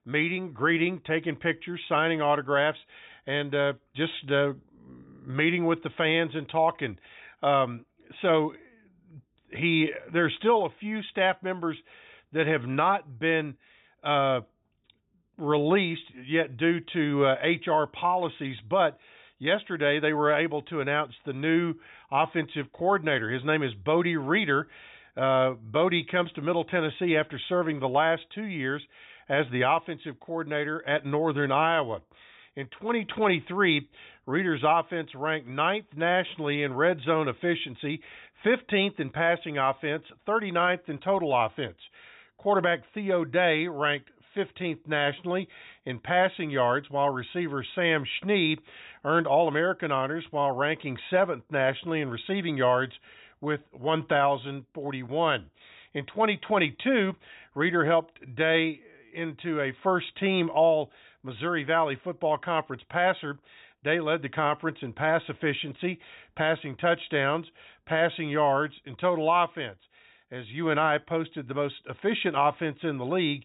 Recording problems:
high frequencies cut off; severe; nothing above 4 kHz

